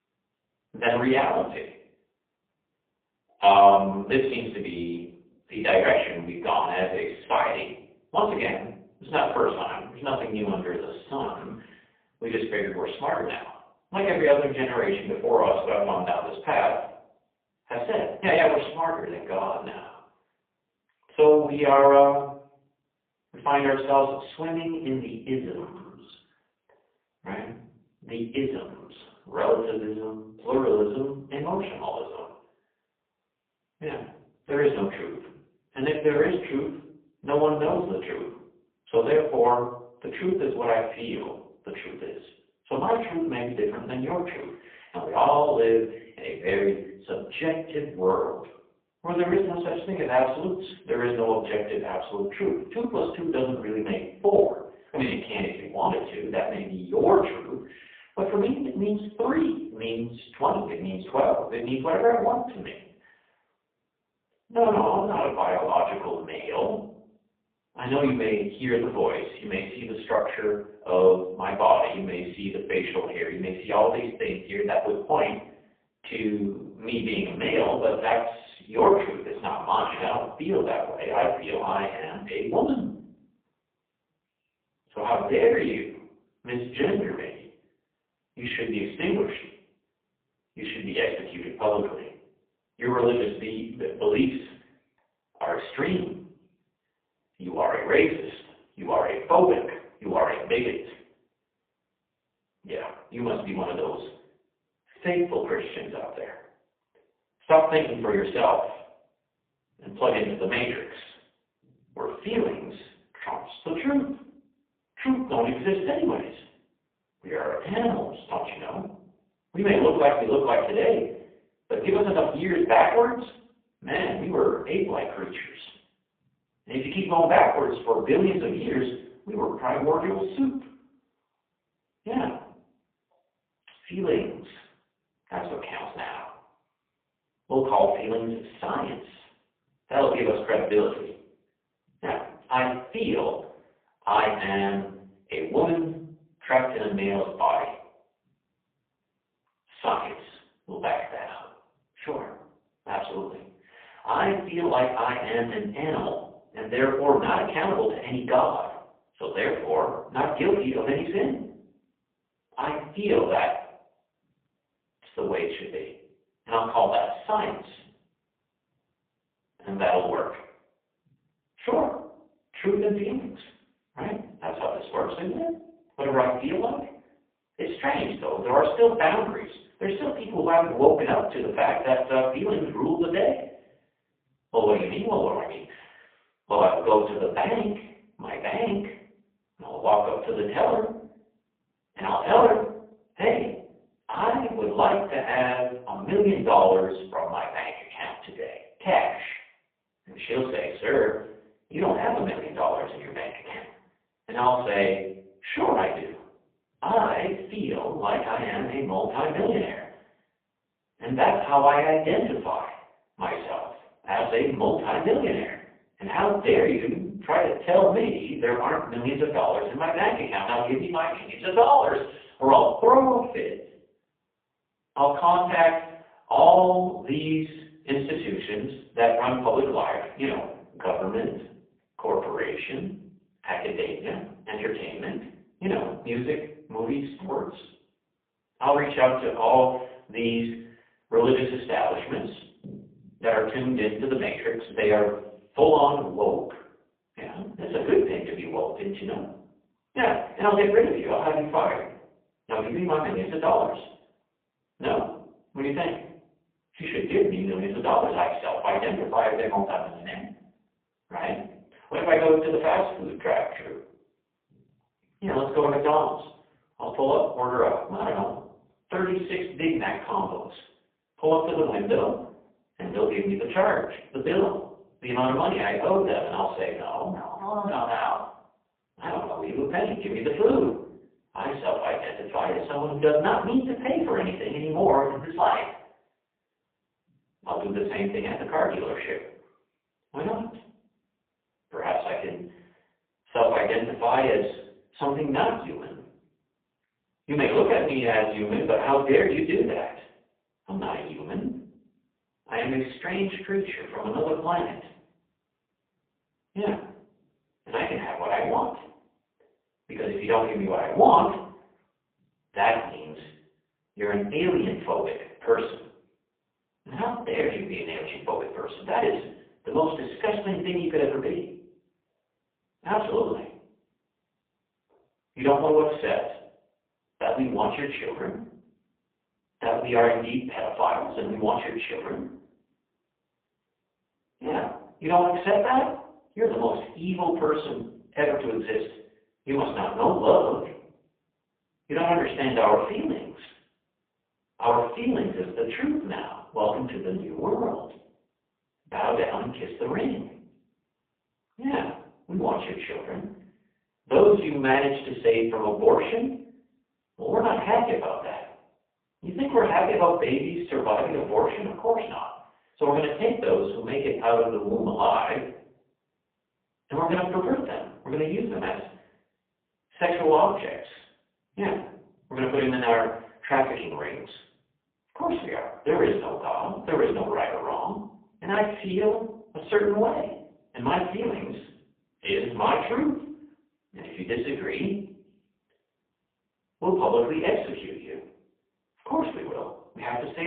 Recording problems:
phone-call audio; poor line
off-mic speech; far
room echo; noticeable; dies away in 0.5 s
abrupt cut into speech; at the end

